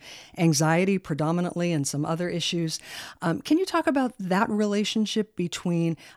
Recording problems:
none

